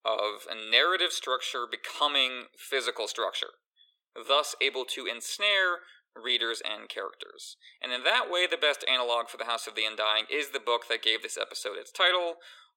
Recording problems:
thin; very; fading below 400 Hz

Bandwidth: 17 kHz